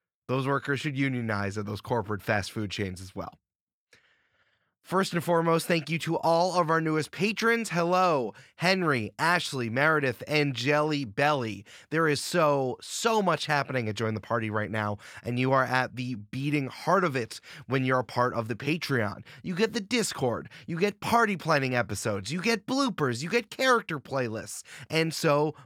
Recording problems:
none

